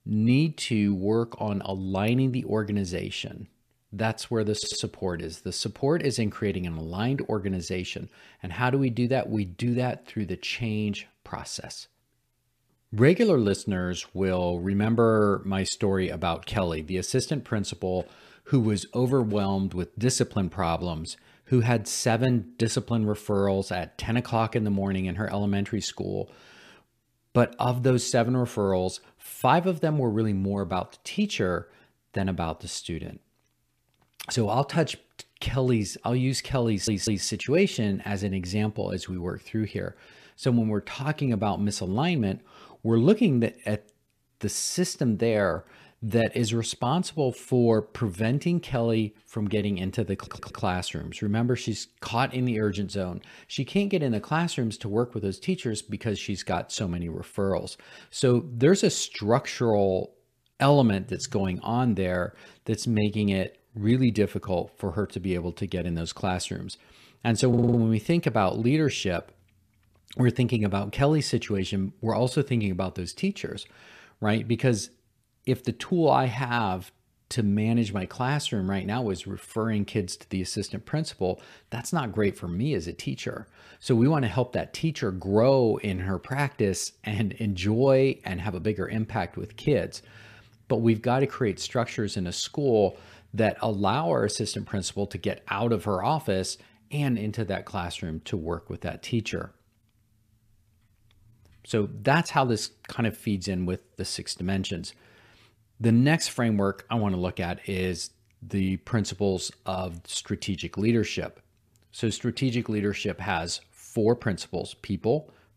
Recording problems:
audio stuttering; 4 times, first at 4.5 s

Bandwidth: 14.5 kHz